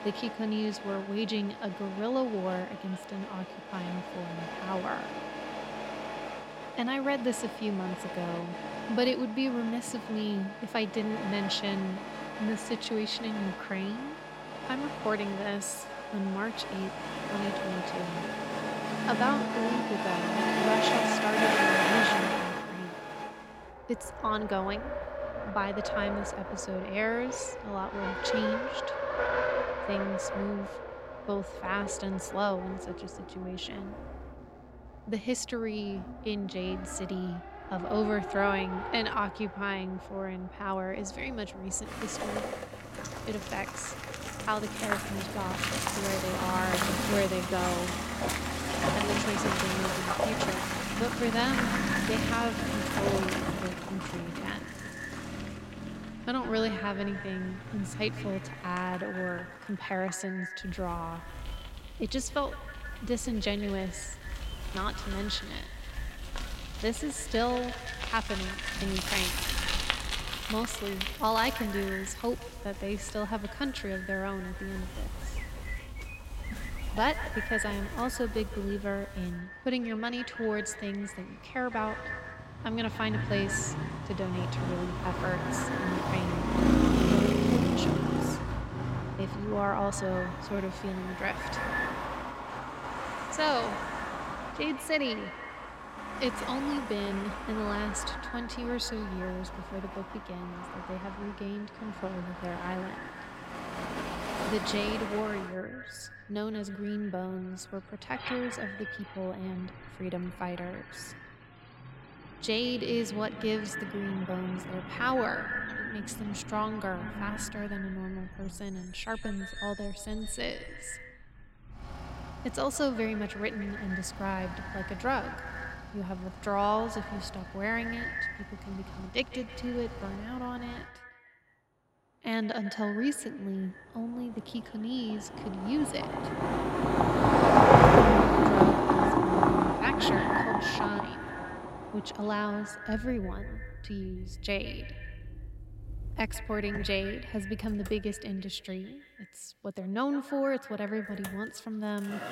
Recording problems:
echo of what is said; strong; from 50 s on; 160 ms later, 8 dB below the speech
traffic noise; very loud; throughout; 2 dB above the speech

